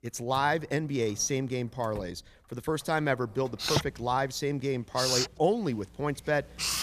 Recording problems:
household noises; loud; throughout; 1 dB below the speech

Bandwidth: 14.5 kHz